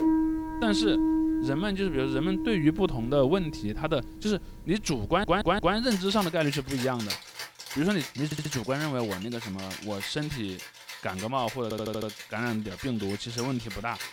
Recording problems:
background music; loud; throughout; 5 dB below the speech
audio stuttering; at 5 s, at 8.5 s and at 12 s

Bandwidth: 18.5 kHz